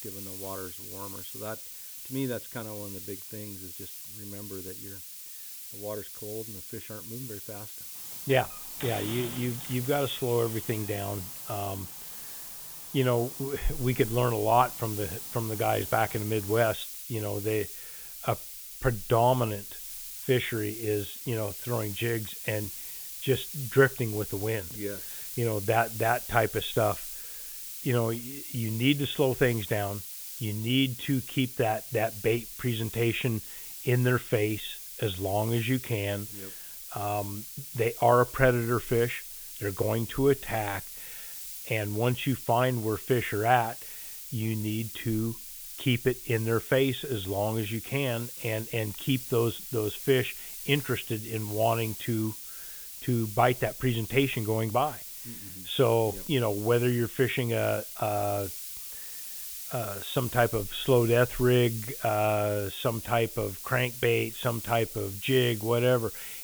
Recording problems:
high frequencies cut off; severe; nothing above 4 kHz
hiss; loud; throughout; 8 dB below the speech
door banging; noticeable; from 8 to 17 s; peak 10 dB below the speech

